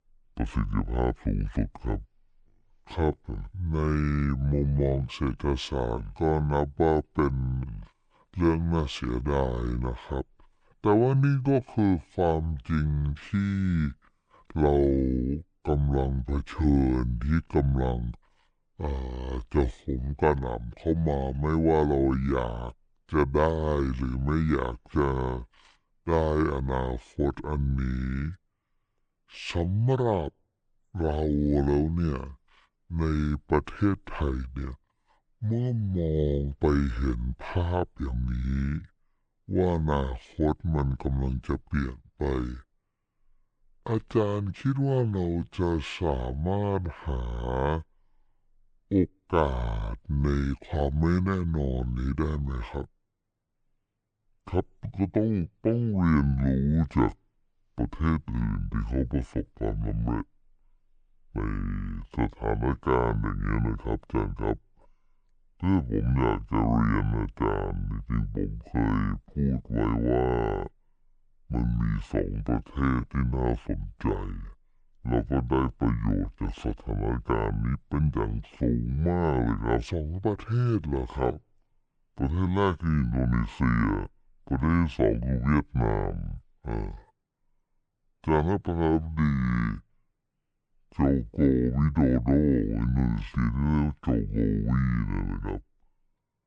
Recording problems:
wrong speed and pitch; too slow and too low; 0.6 times normal speed

